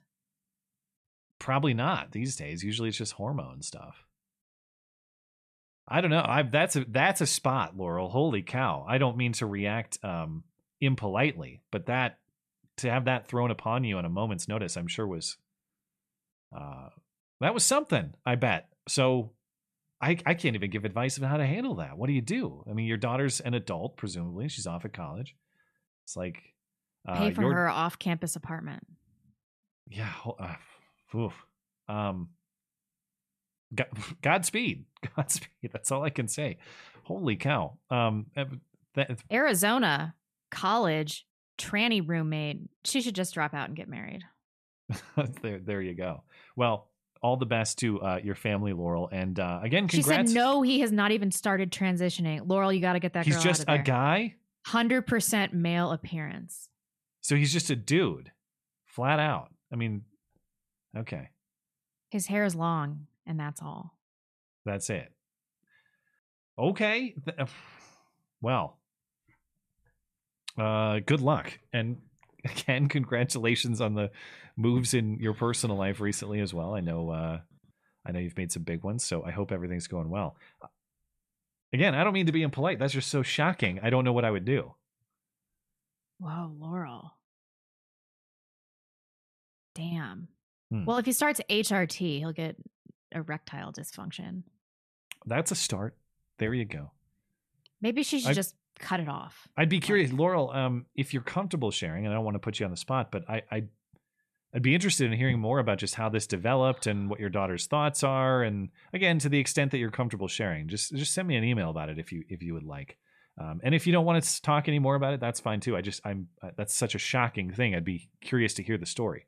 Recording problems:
none

